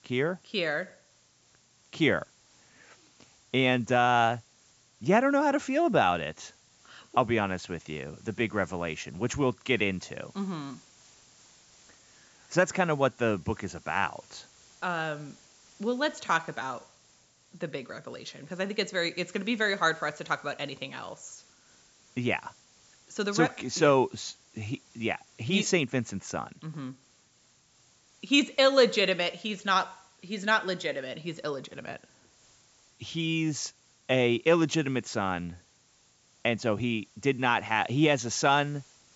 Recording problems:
high frequencies cut off; noticeable; nothing above 8 kHz
hiss; faint; throughout; 30 dB below the speech

